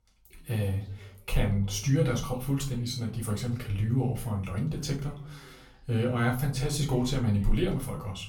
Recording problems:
off-mic speech; far
room echo; slight; dies away in 0.3 s
voice in the background; faint; throughout; 25 dB below the speech

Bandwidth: 18 kHz